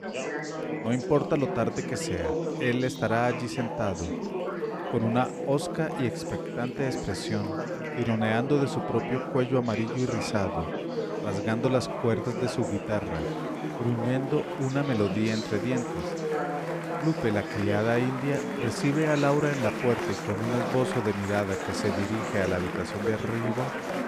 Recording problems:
chatter from many people; loud; throughout; 3 dB below the speech

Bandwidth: 15 kHz